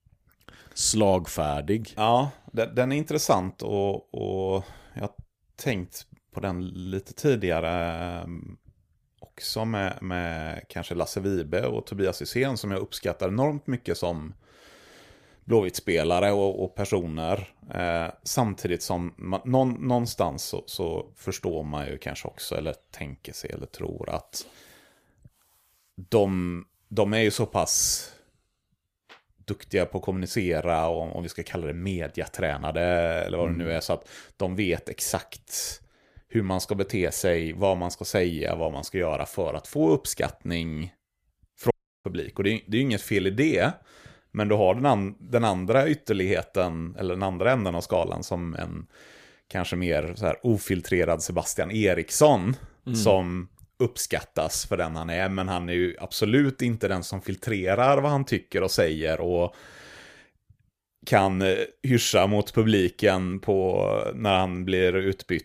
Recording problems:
audio cutting out; at 42 s

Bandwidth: 15 kHz